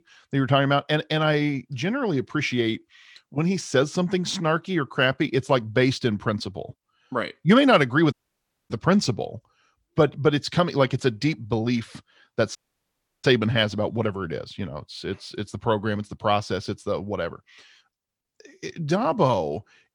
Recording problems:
audio cutting out; at 8 s for 0.5 s and at 13 s for 0.5 s

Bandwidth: 18 kHz